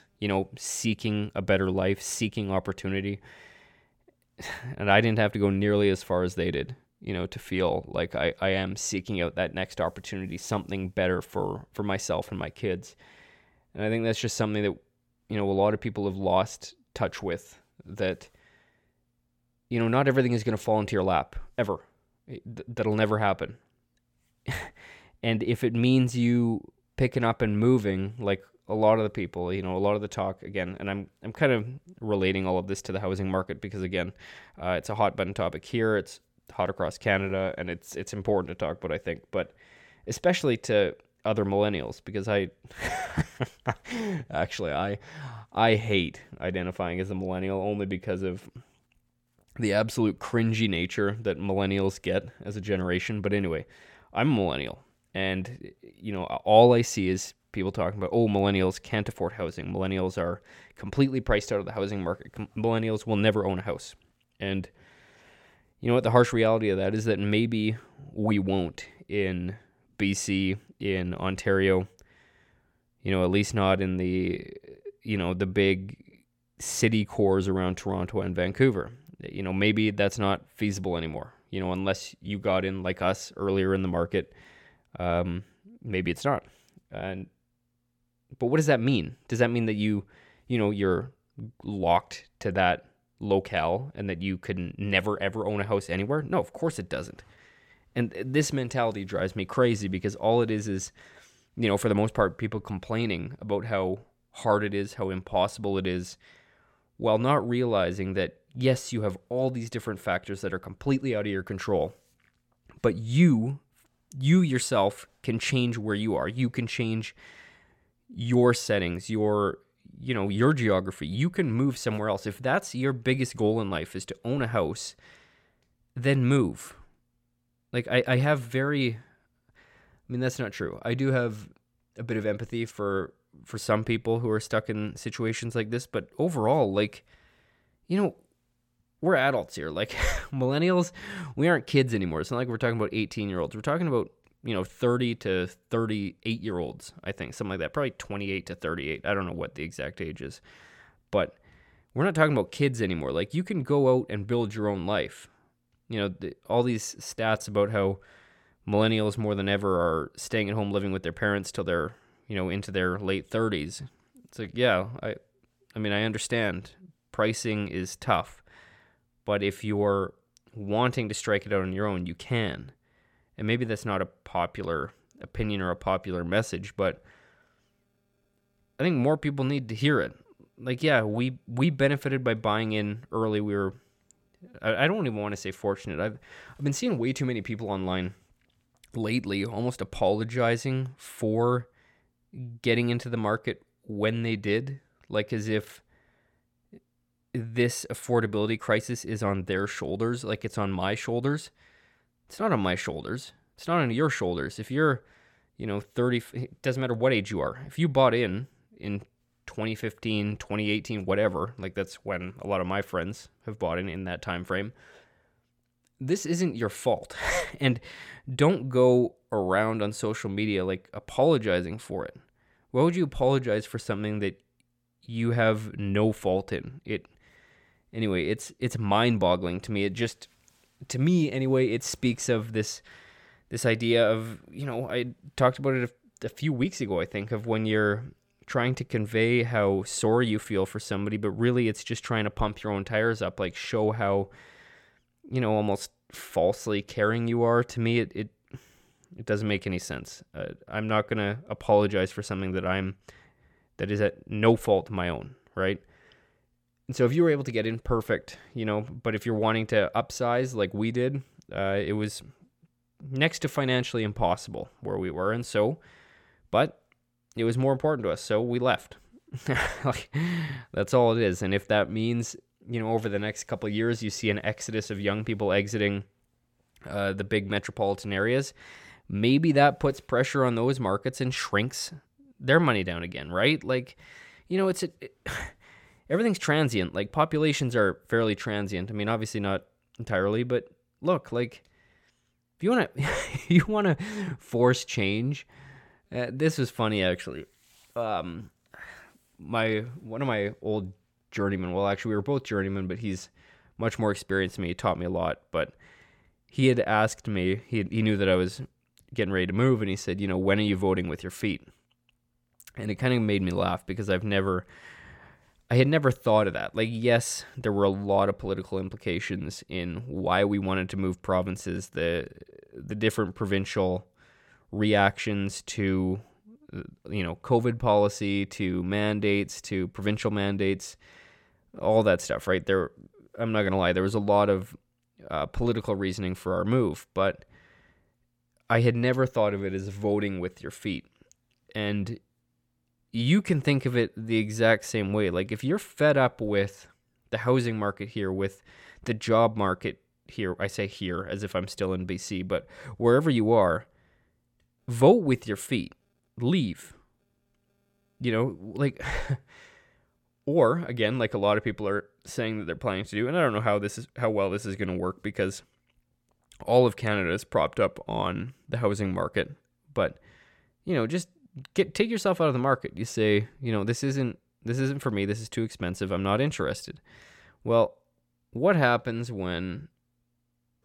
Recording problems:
none

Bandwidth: 17.5 kHz